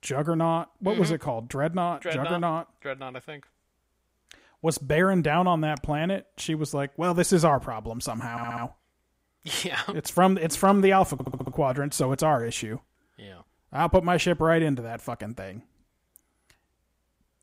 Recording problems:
audio stuttering; at 8.5 s and at 11 s

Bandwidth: 15.5 kHz